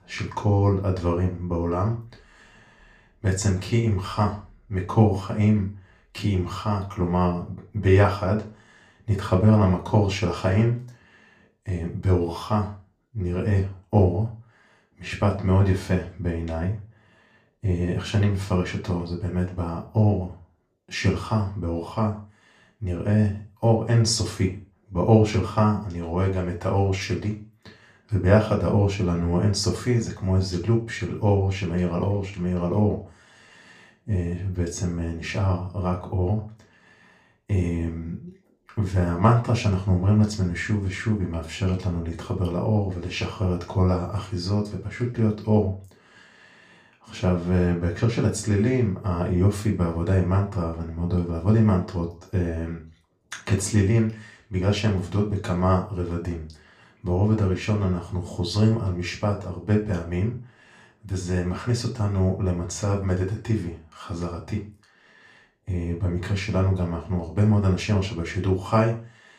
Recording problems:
off-mic speech; far
room echo; slight; dies away in 0.3 s

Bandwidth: 15 kHz